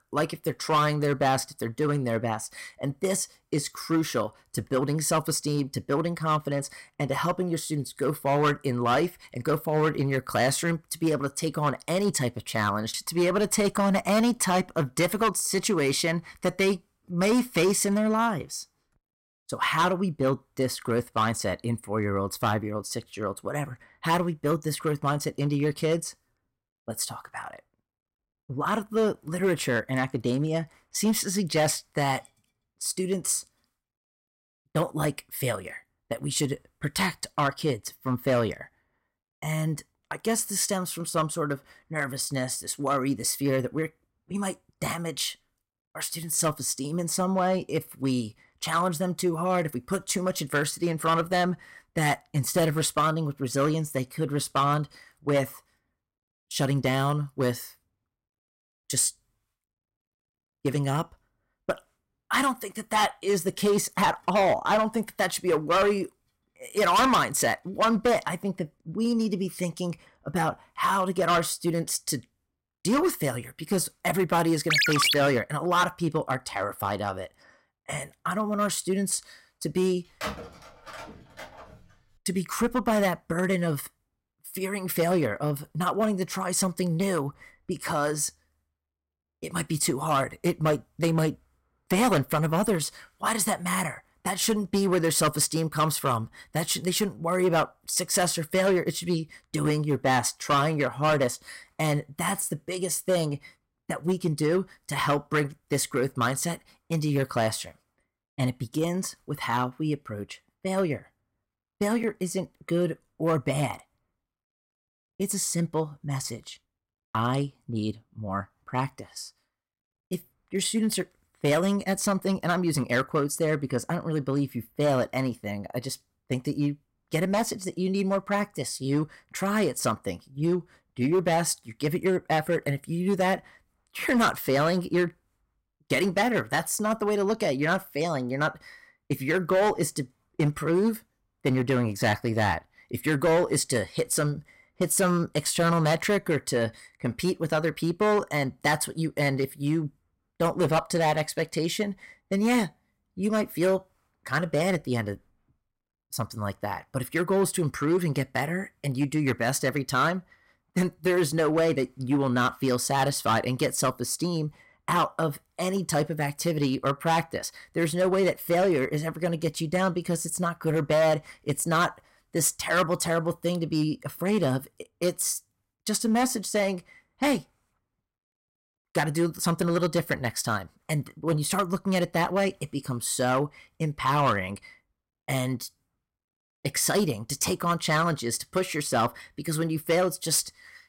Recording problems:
distortion; slight; 4% of the sound clipped
phone ringing; loud; at 1:15; peak 6 dB above the speech
phone ringing; noticeable; from 1:20 to 1:22; peak 8 dB below the speech

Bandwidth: 16 kHz